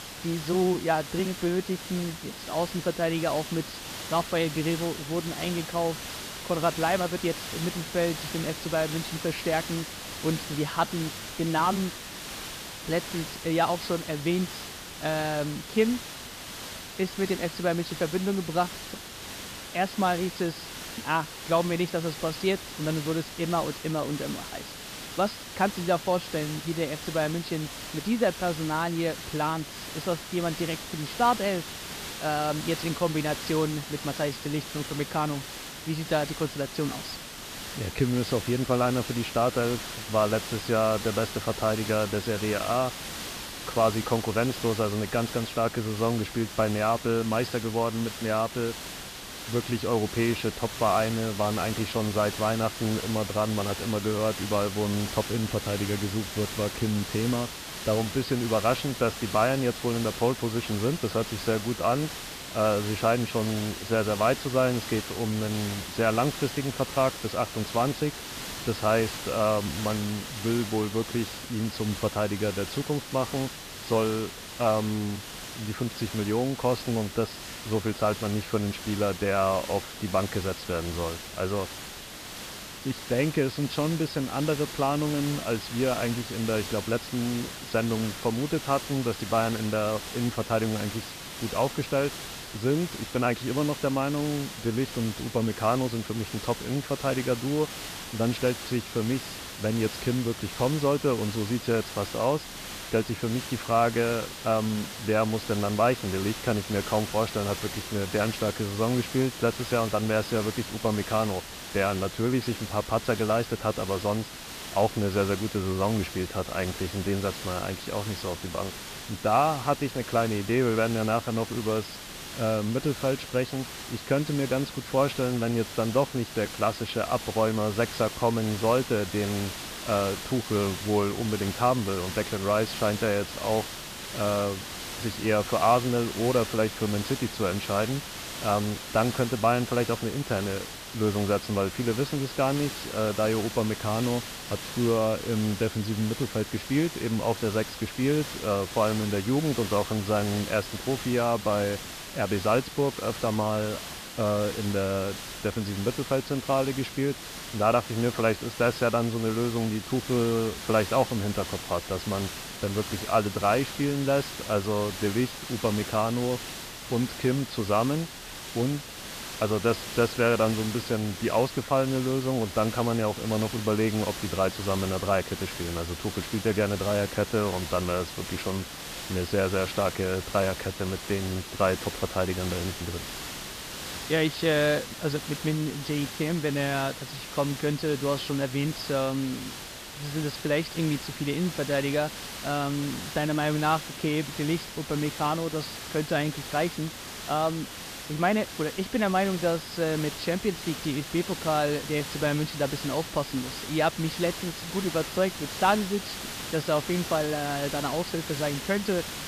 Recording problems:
high frequencies cut off; noticeable; nothing above 5.5 kHz
hiss; loud; throughout; 8 dB below the speech

